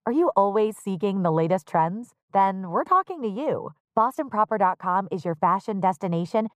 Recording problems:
muffled; very; fading above 1.5 kHz

